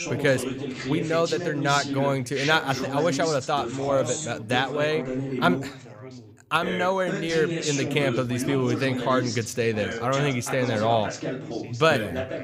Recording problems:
background chatter; loud; throughout; 3 voices, 6 dB below the speech

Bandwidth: 15.5 kHz